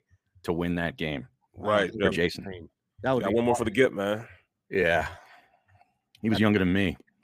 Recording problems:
uneven, jittery; strongly; from 2 to 6.5 s

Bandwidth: 15 kHz